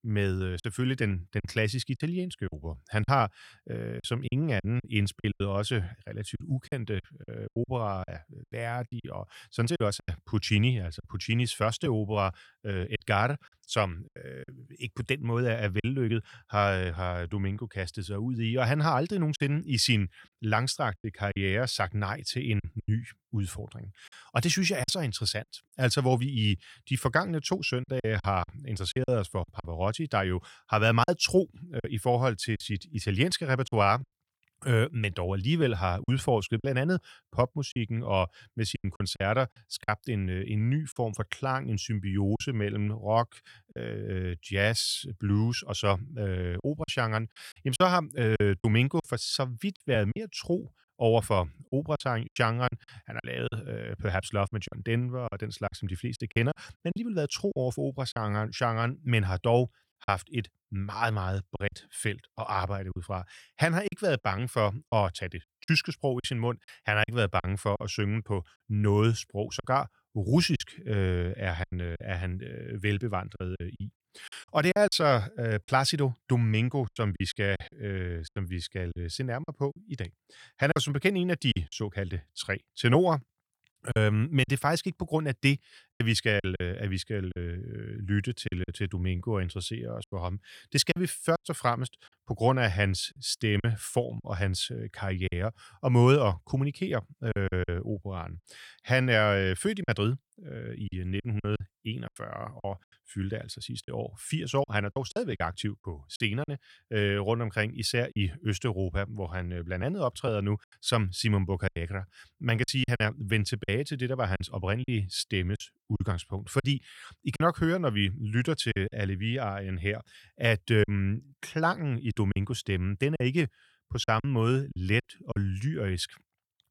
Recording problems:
choppy; very; 7% of the speech affected

